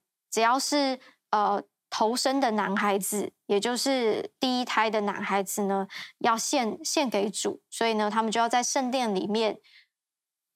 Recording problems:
none

